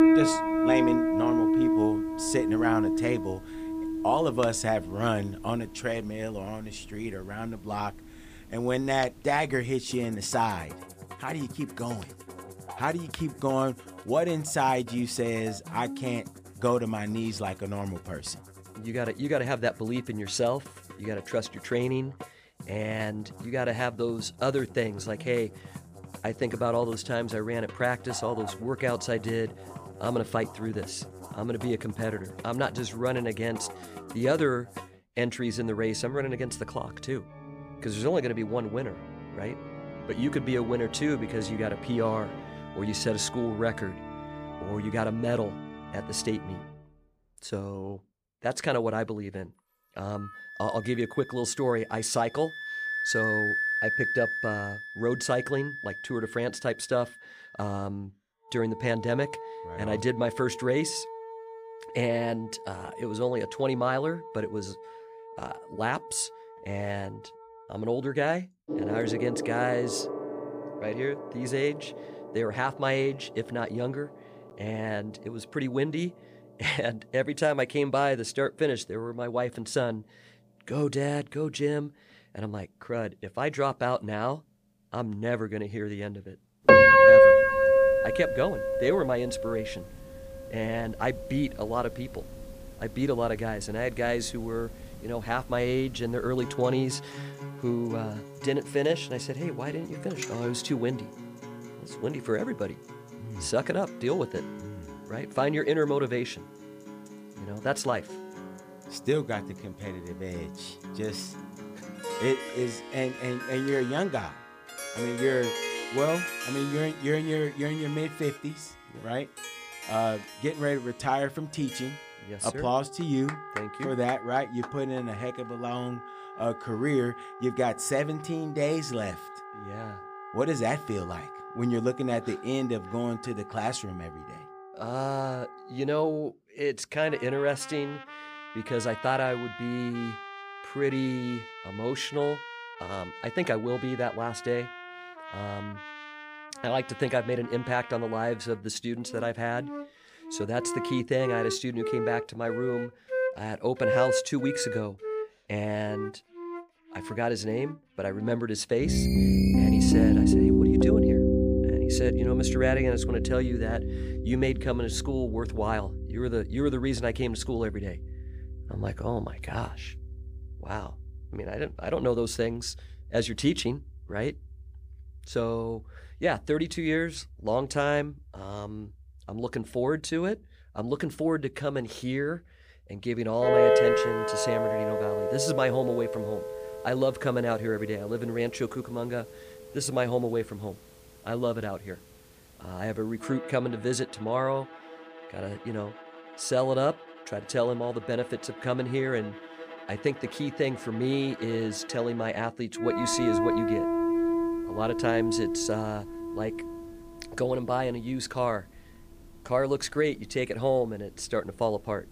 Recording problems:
background music; very loud; throughout; 1 dB above the speech
phone ringing; noticeable; from 2:39 to 2:40; peak 8 dB below the speech

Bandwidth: 15 kHz